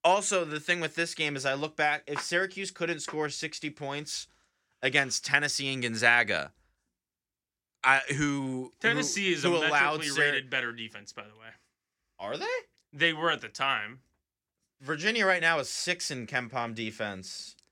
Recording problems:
none

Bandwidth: 16.5 kHz